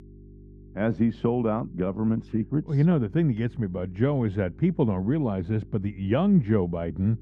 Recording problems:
muffled; very; fading above 3.5 kHz
electrical hum; faint; throughout; 50 Hz, 25 dB below the speech

